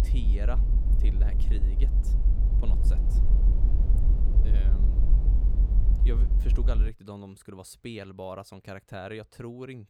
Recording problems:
low rumble; loud; until 7 s; 3 dB below the speech

